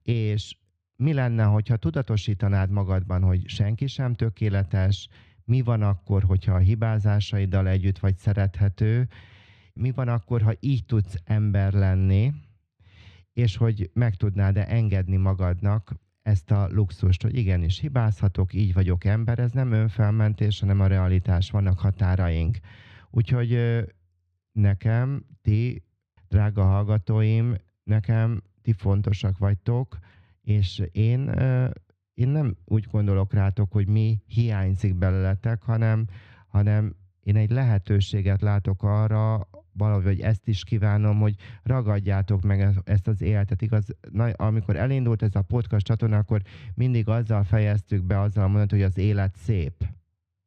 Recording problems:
muffled; slightly; fading above 2.5 kHz

